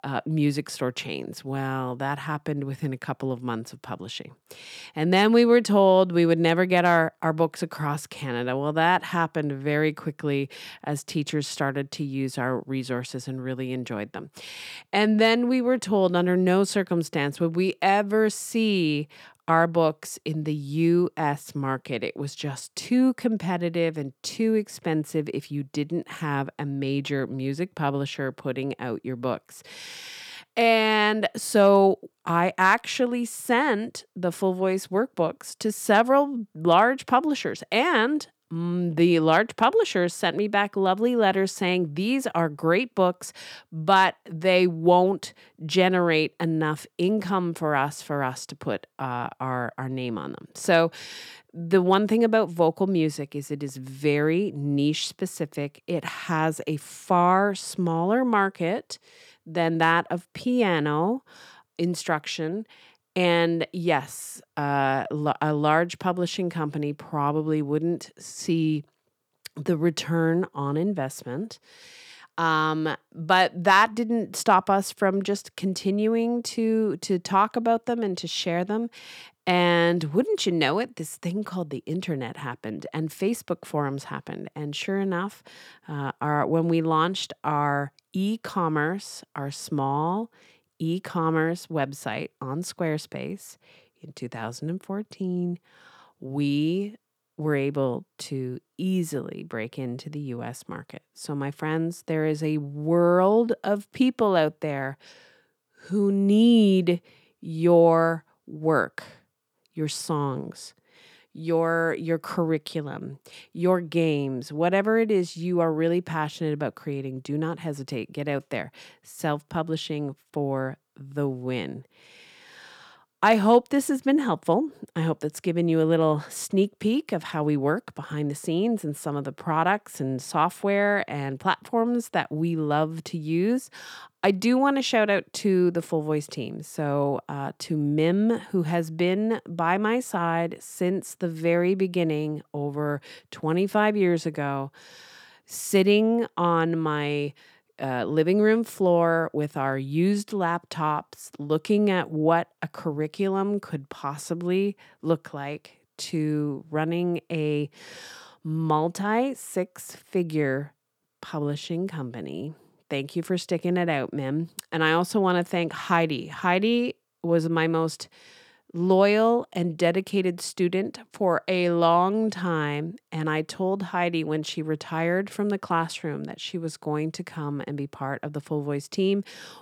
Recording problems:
none

